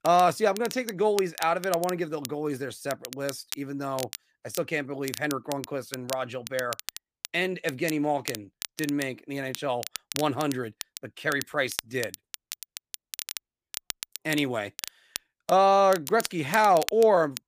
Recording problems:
crackle, like an old record; noticeable; 10 dB below the speech

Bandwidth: 15 kHz